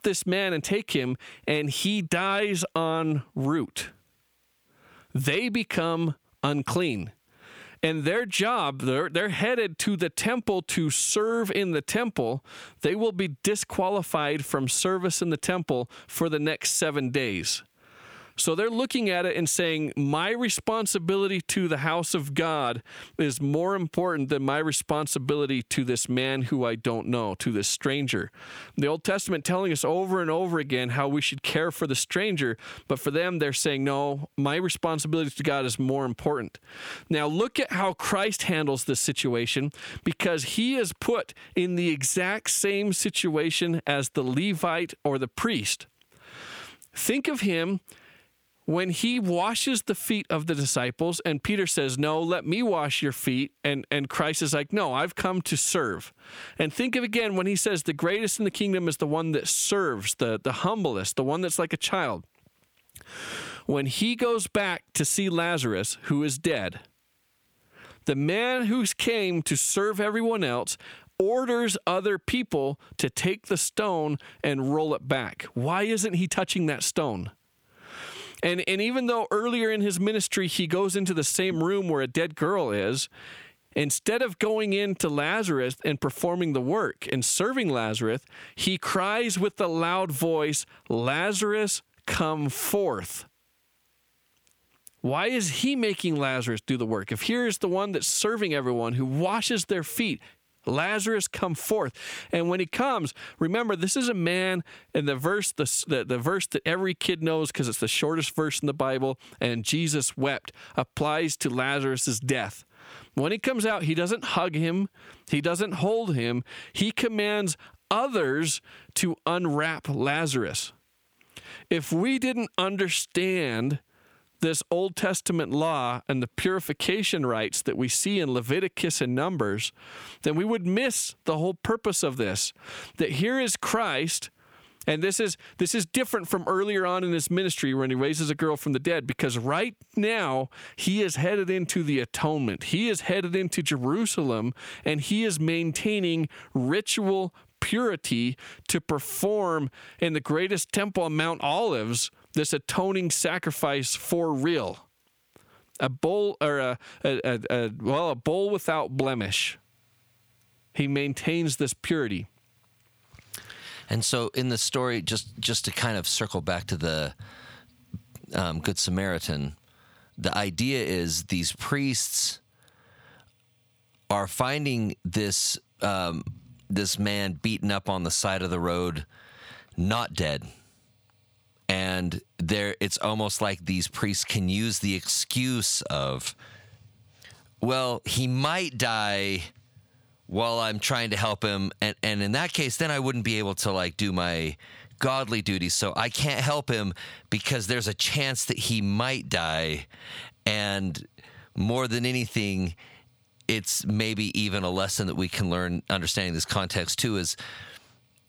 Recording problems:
squashed, flat; heavily

